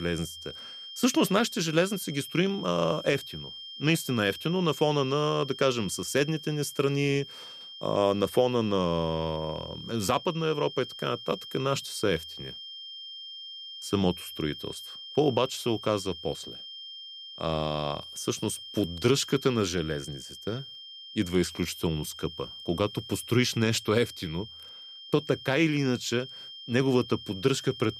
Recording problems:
high-pitched whine; noticeable; throughout; 3 kHz, 10 dB below the speech
abrupt cut into speech; at the start

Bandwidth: 14.5 kHz